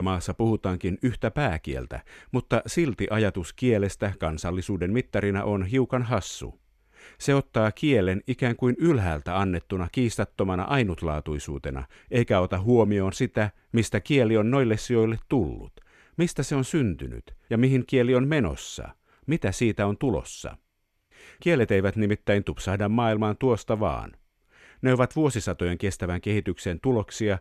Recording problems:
abrupt cut into speech; at the start

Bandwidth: 13.5 kHz